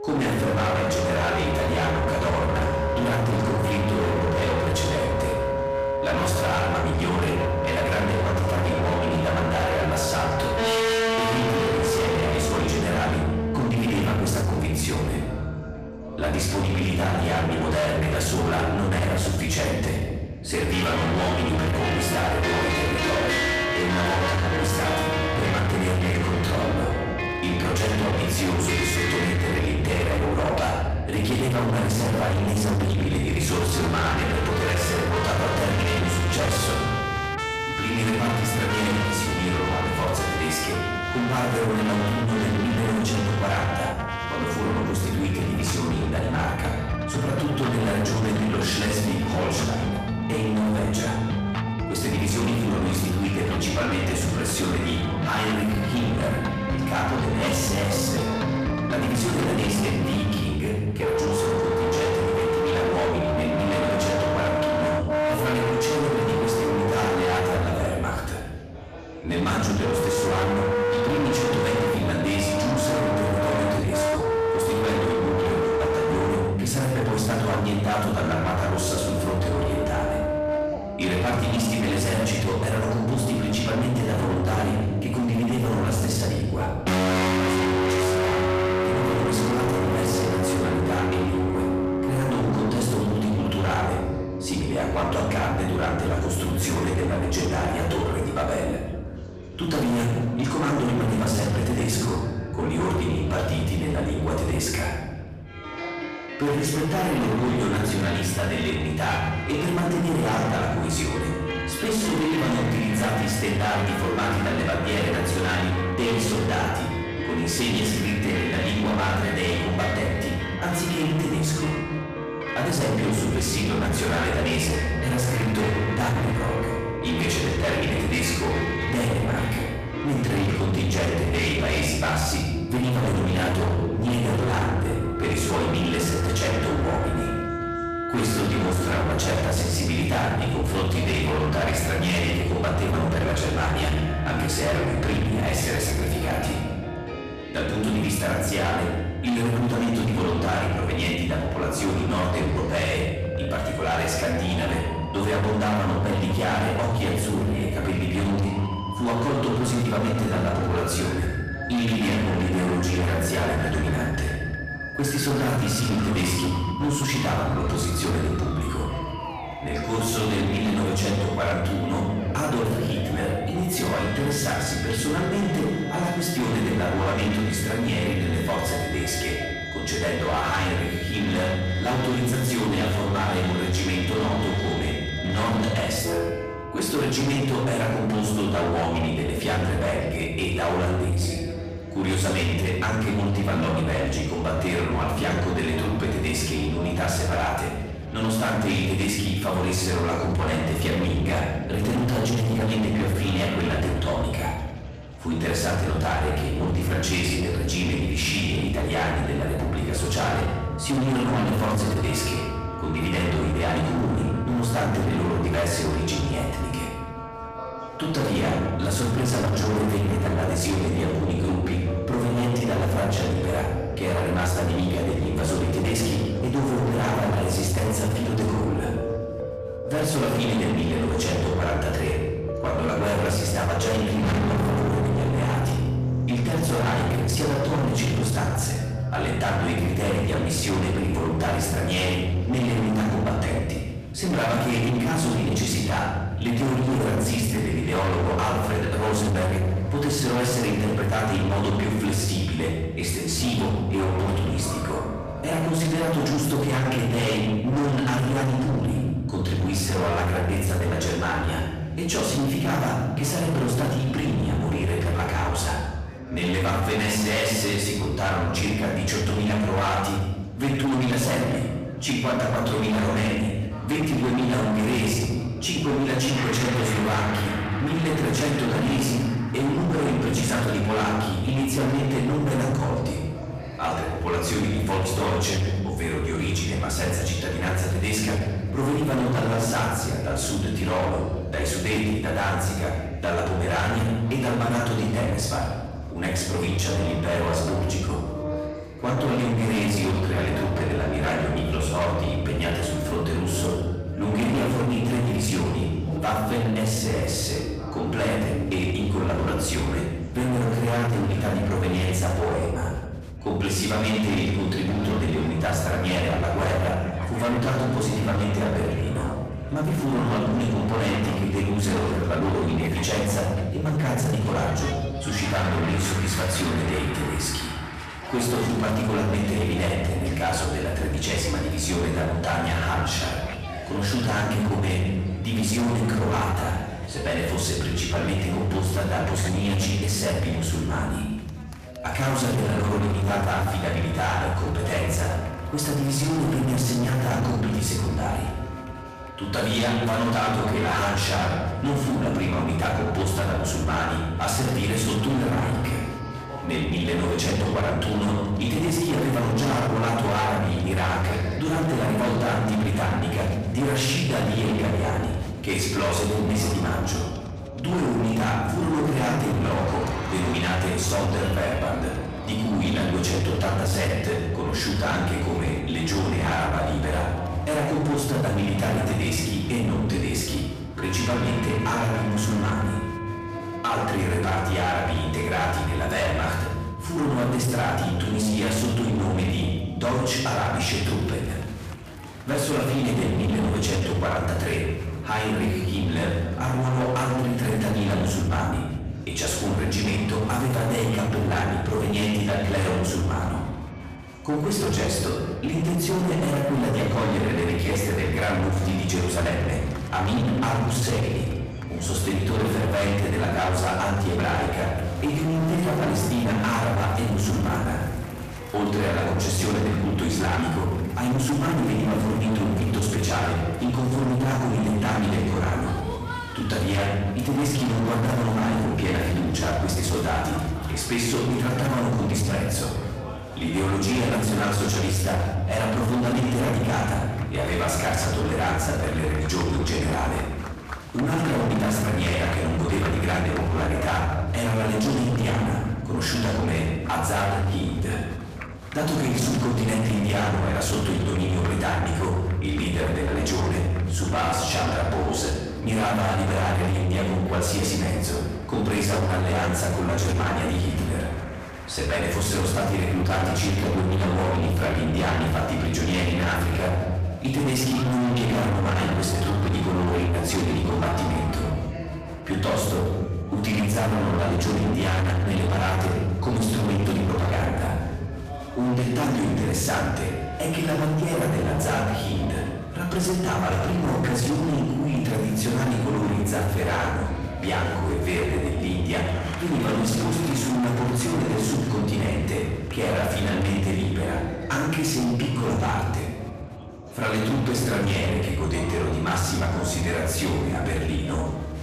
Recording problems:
distortion; heavy; 33% of the sound clipped
off-mic speech; far
room echo; noticeable; dies away in 1.3 s
chatter from many people; noticeable; throughout; 15 dB below the speech
background music; very faint; throughout; 5 dB below the speech

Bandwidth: 14.5 kHz